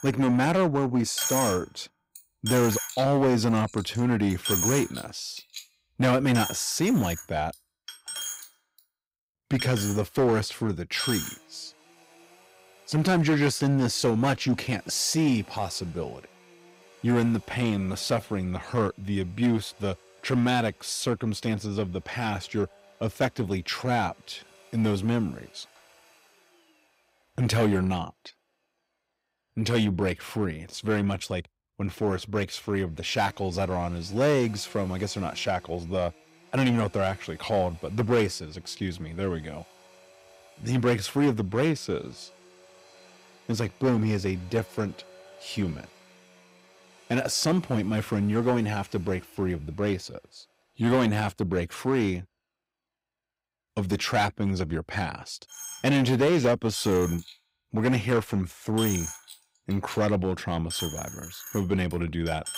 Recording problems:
distortion; slight; 4% of the sound clipped
household noises; loud; throughout; 8 dB below the speech

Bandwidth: 15.5 kHz